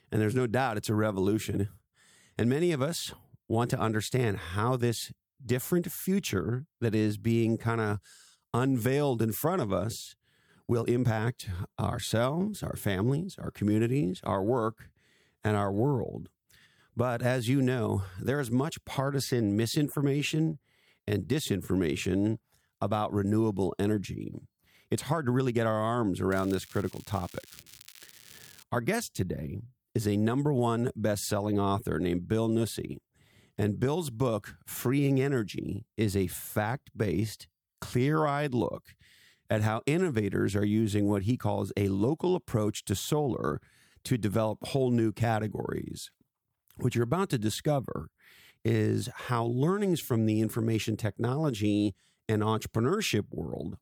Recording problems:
crackling; faint; from 26 to 29 s; 20 dB below the speech
uneven, jittery; strongly; from 8 to 52 s

